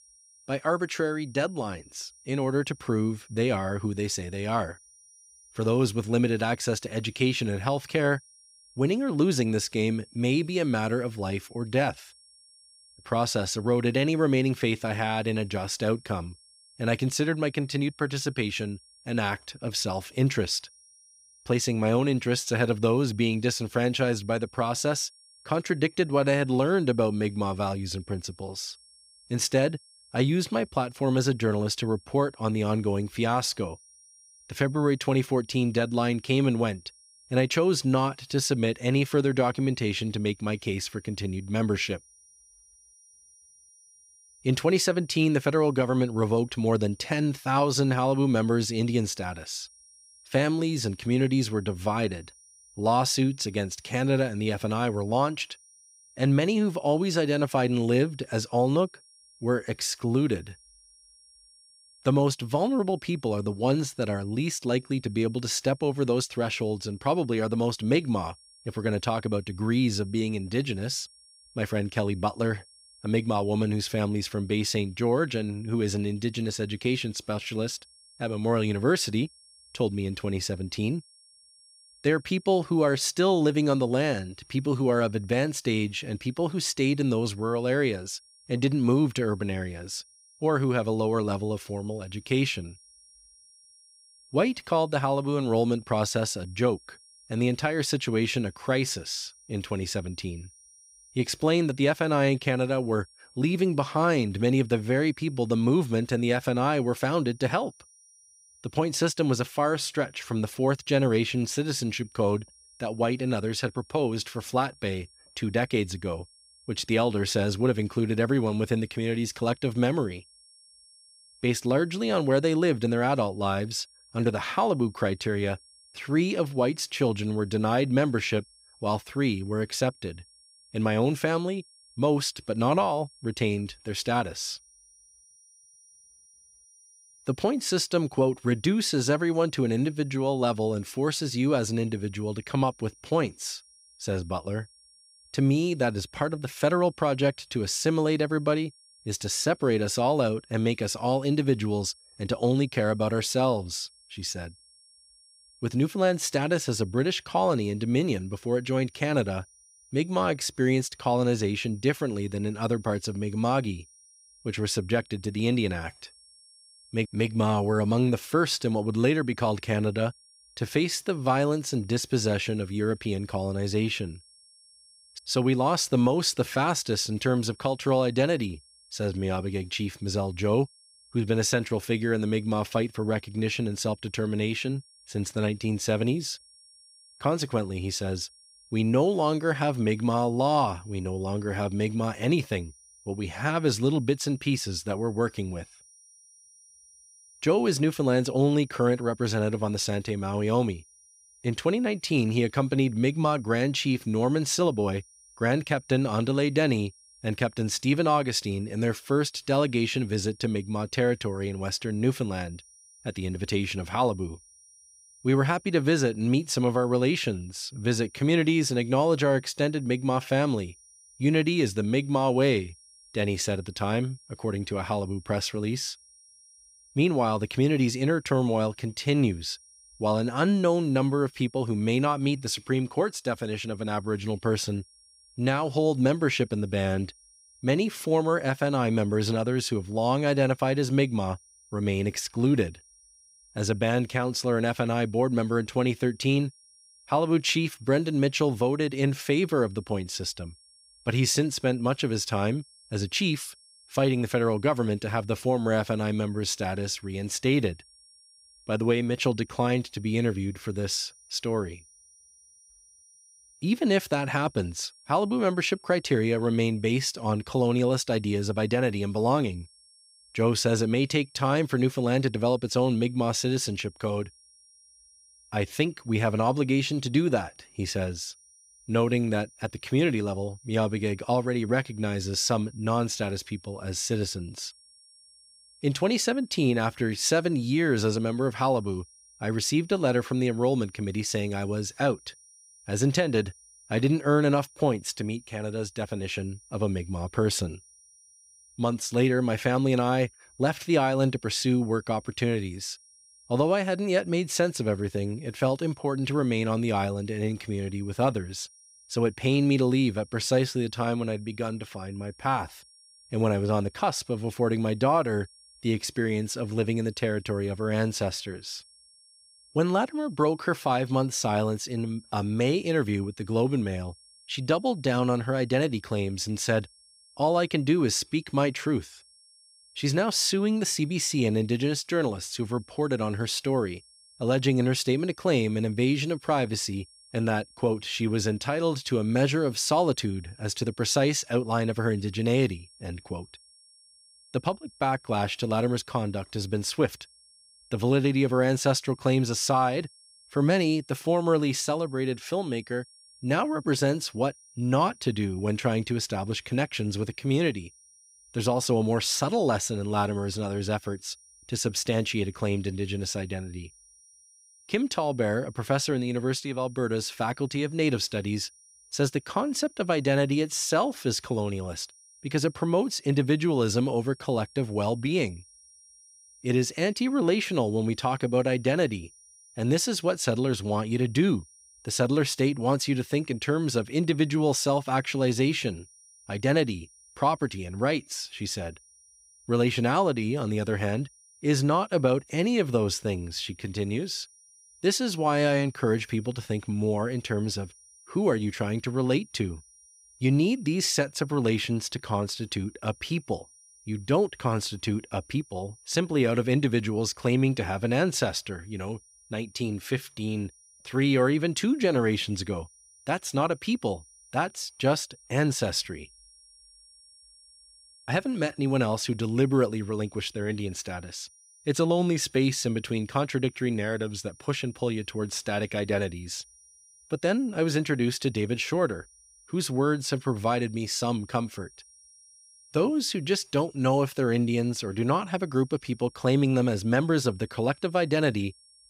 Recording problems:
high-pitched whine; faint; throughout; 5.5 kHz, 25 dB below the speech

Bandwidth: 15.5 kHz